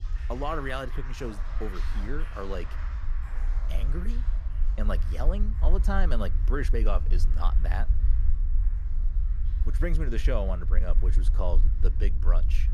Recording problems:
background music; noticeable; throughout; 15 dB below the speech
low rumble; noticeable; throughout; 15 dB below the speech

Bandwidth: 13.5 kHz